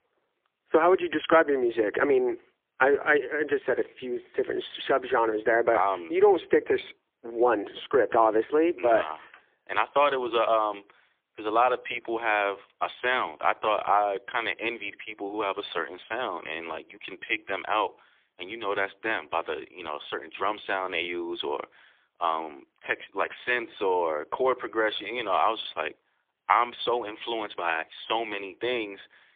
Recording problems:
phone-call audio; poor line; nothing above 3.5 kHz

